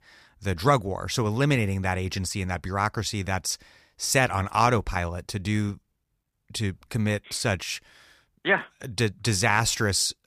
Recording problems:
none

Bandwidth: 15 kHz